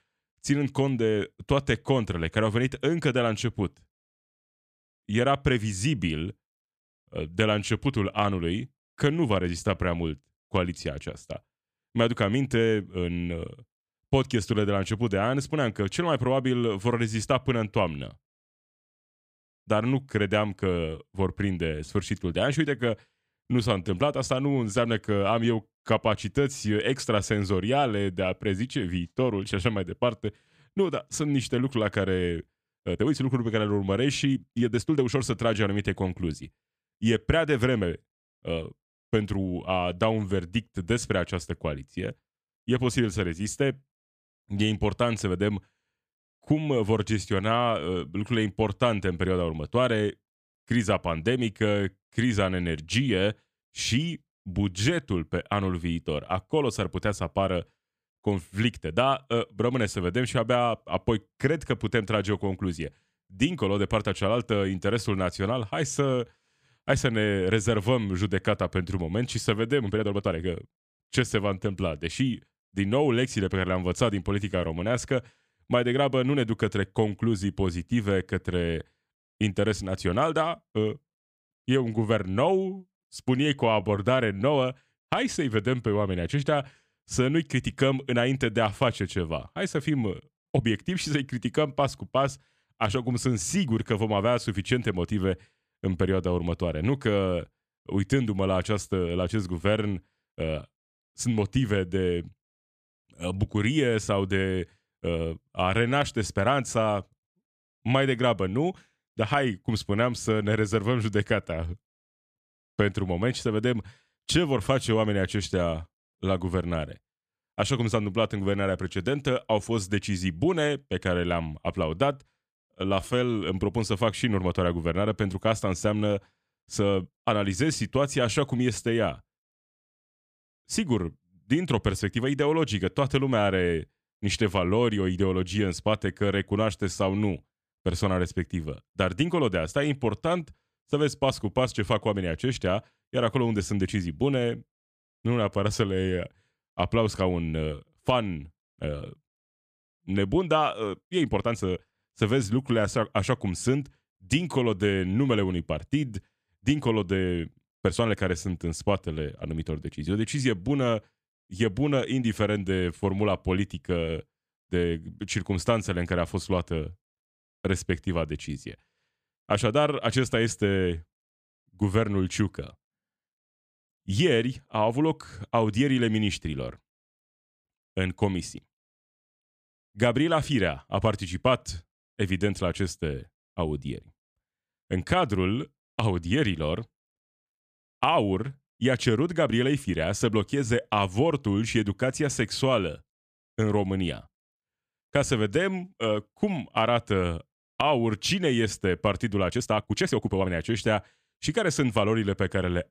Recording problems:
uneven, jittery; strongly; from 9 s to 3:20

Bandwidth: 14.5 kHz